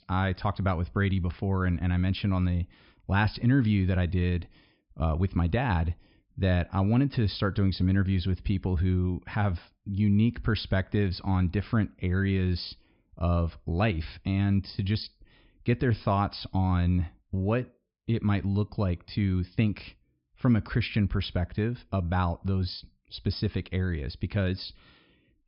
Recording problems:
high frequencies cut off; noticeable; nothing above 5.5 kHz

